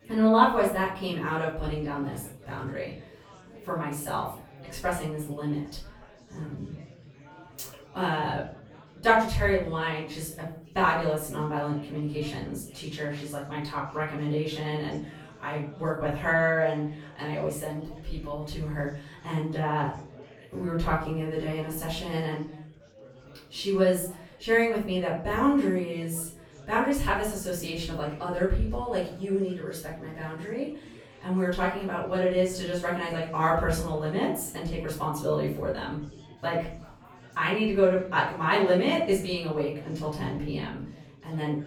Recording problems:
off-mic speech; far
room echo; noticeable; dies away in 0.4 s
chatter from many people; faint; throughout; 25 dB below the speech

